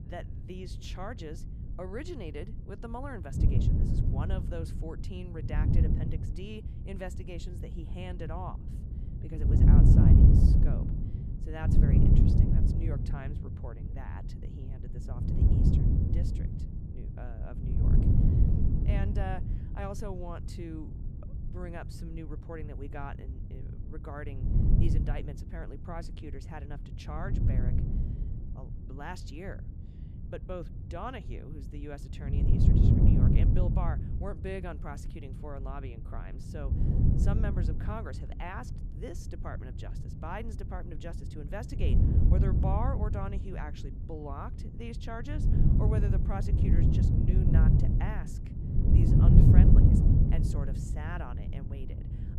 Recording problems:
wind noise on the microphone; heavy; 4 dB above the speech

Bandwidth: 14 kHz